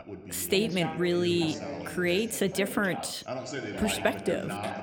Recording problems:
background chatter; loud; throughout; 2 voices, 8 dB below the speech

